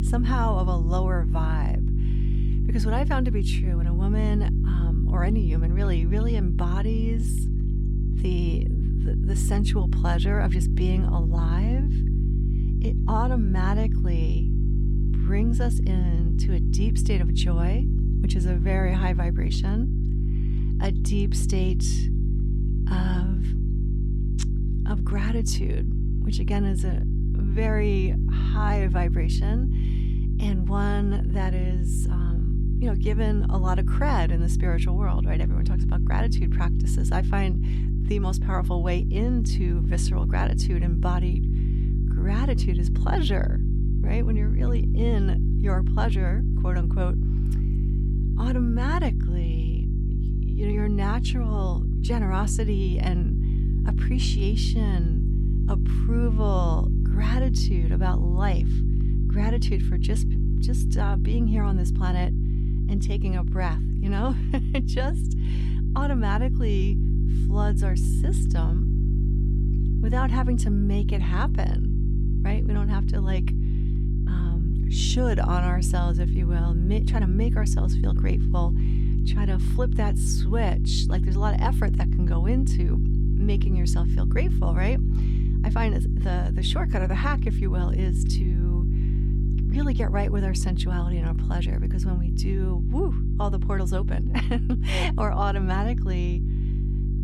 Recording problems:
electrical hum; loud; throughout; 50 Hz, 5 dB below the speech

